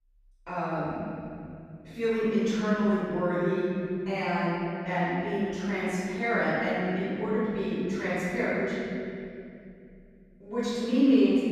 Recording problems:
room echo; strong; dies away in 3 s
off-mic speech; far

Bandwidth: 15.5 kHz